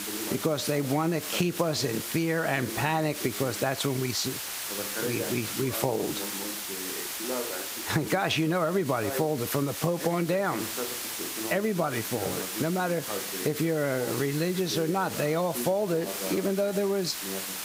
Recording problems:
squashed, flat; somewhat, background pumping
hiss; loud; throughout; 6 dB below the speech
voice in the background; noticeable; throughout; 10 dB below the speech

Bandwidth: 15.5 kHz